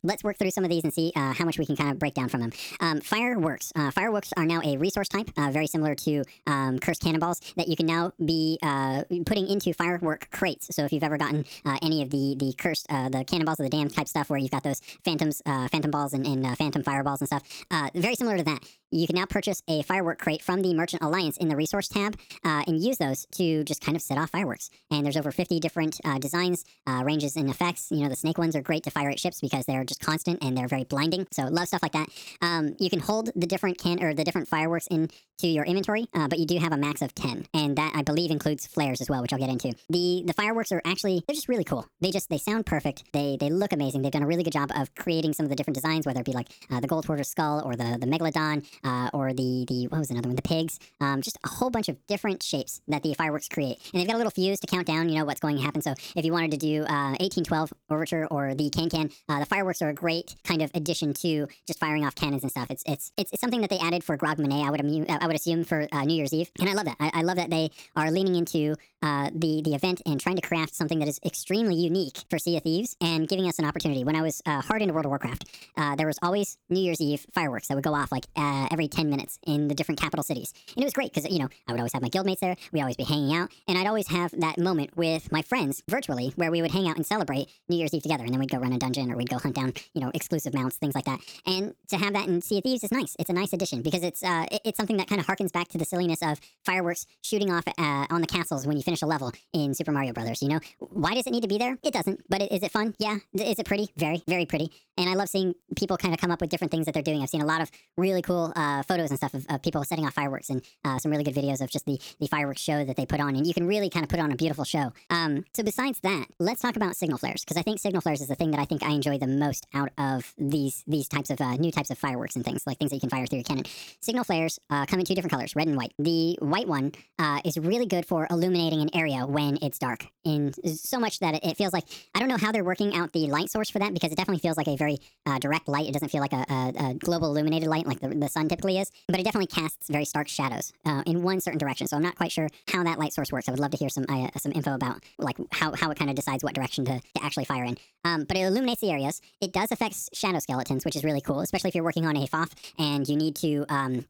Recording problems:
wrong speed and pitch; too fast and too high; 1.5 times normal speed

